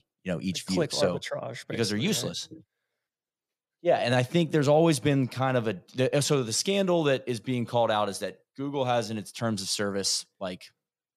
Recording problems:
none

